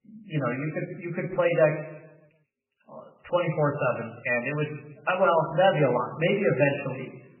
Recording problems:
garbled, watery; badly; nothing above 2.5 kHz
room echo; slight; dies away in 0.9 s
off-mic speech; somewhat distant

